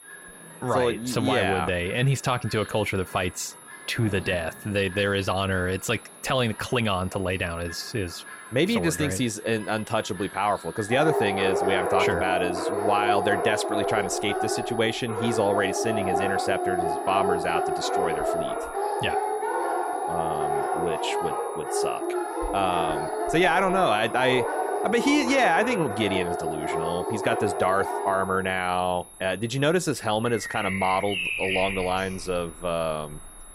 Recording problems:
animal sounds; loud; throughout; 2 dB below the speech
high-pitched whine; noticeable; throughout; 11 kHz, 20 dB below the speech

